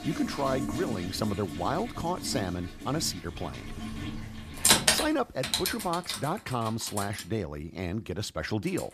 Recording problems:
household noises; very loud; throughout; 2 dB above the speech

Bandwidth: 14.5 kHz